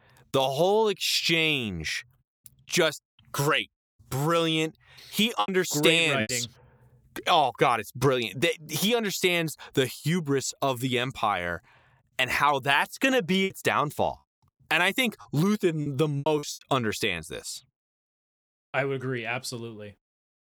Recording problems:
choppy; very; at 5.5 s and from 13 to 17 s; 8% of the speech affected

